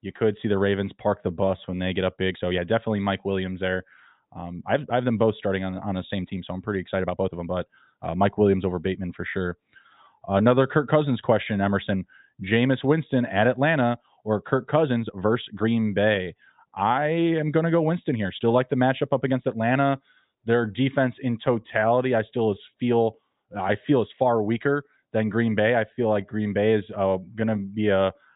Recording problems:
high frequencies cut off; severe; nothing above 4 kHz
uneven, jittery; strongly; from 1 to 28 s

